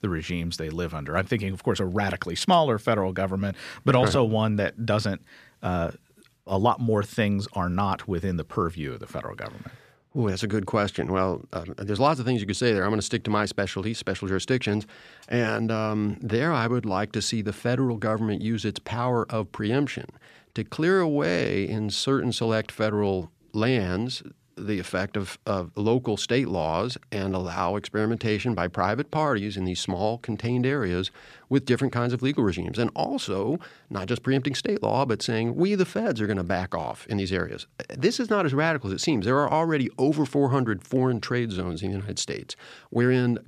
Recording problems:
none

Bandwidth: 14.5 kHz